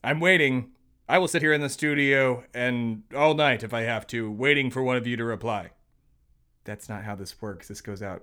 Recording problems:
uneven, jittery; strongly; from 1 to 7.5 s

